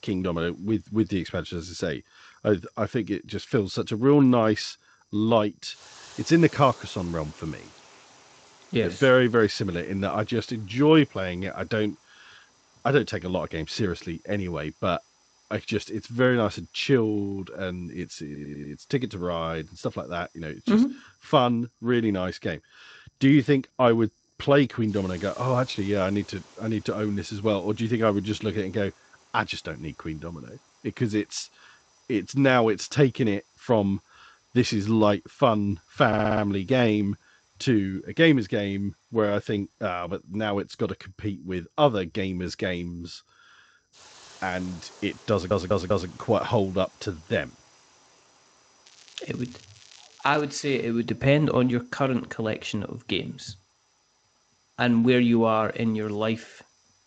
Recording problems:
garbled, watery; slightly; nothing above 7.5 kHz
hiss; faint; throughout; 30 dB below the speech
crackling; faint; from 49 to 50 s; 25 dB below the speech
high-pitched whine; very faint; throughout; 6 kHz, 50 dB below the speech
audio stuttering; at 18 s, at 36 s and at 45 s

